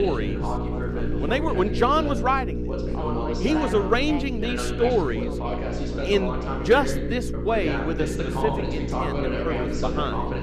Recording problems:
background chatter; loud; throughout; 2 voices, 6 dB below the speech
electrical hum; noticeable; throughout; 60 Hz, 10 dB below the speech
abrupt cut into speech; at the start

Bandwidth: 14.5 kHz